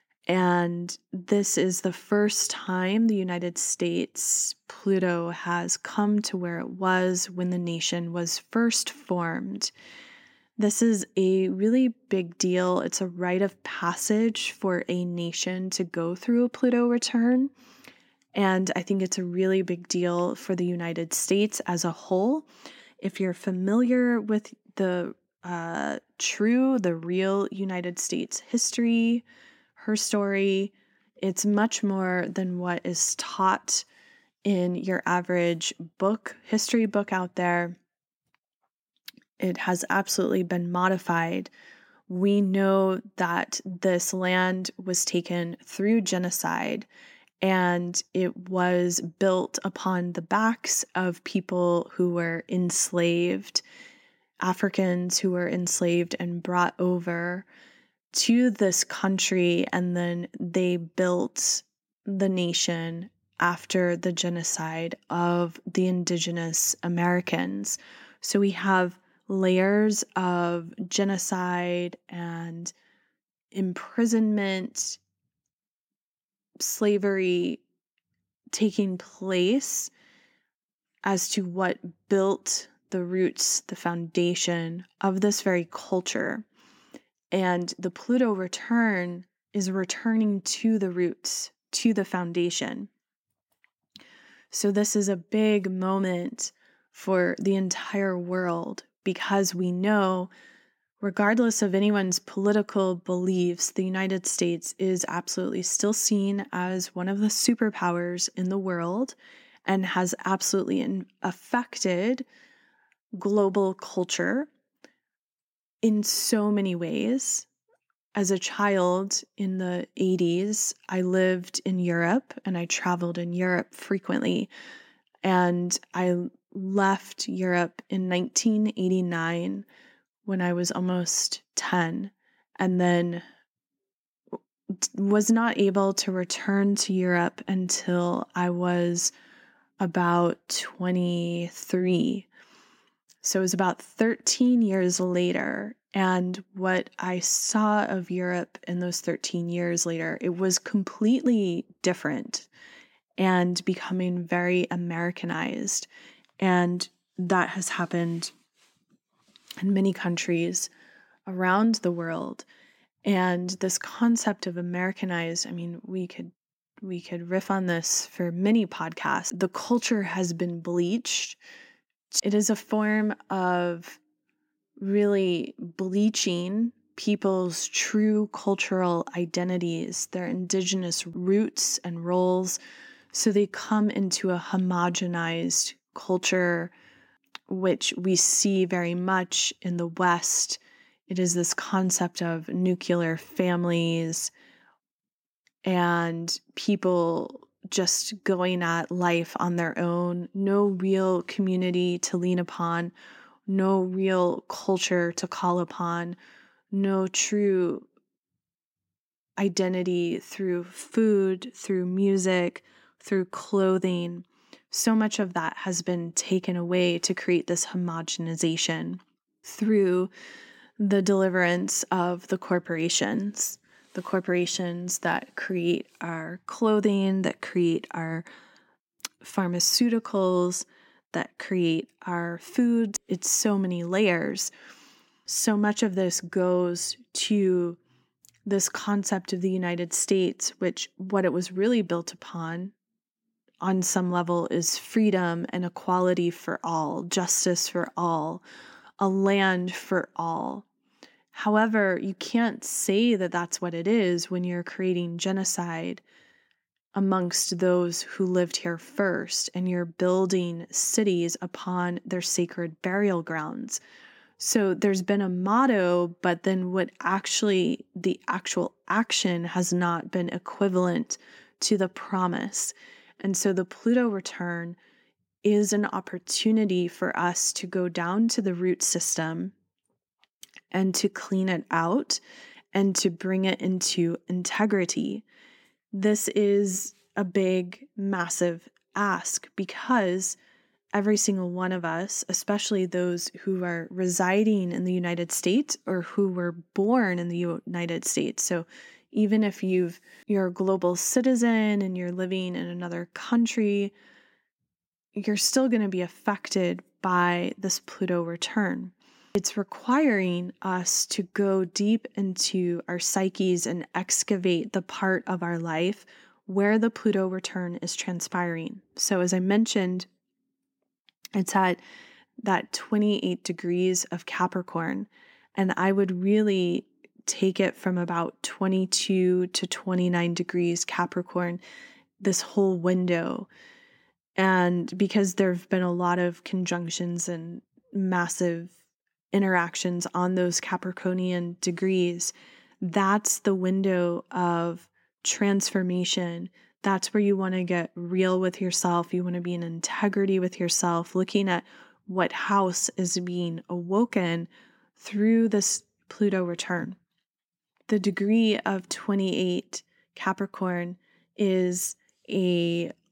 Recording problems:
none

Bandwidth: 16.5 kHz